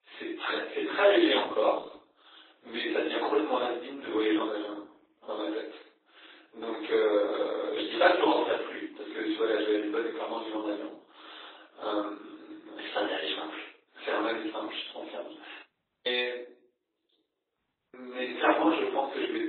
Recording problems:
off-mic speech; far
garbled, watery; badly; nothing above 4 kHz
thin; very; fading below 300 Hz
room echo; slight; dies away in 0.6 s
audio cutting out; at 16 s and at 18 s

